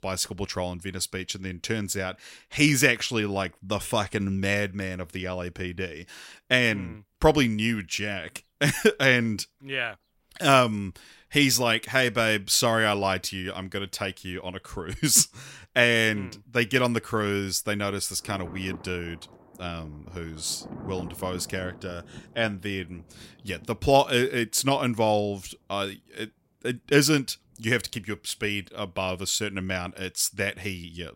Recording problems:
rain or running water; faint; throughout; 20 dB below the speech

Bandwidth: 16 kHz